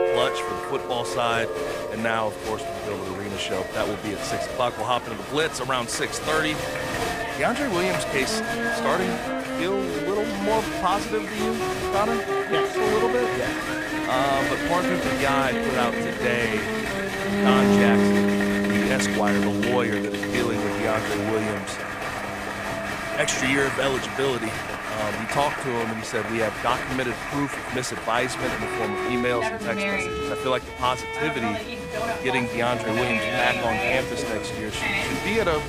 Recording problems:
crowd noise; loud; throughout; 2 dB below the speech
background music; loud; throughout; 1 dB below the speech

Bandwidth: 15 kHz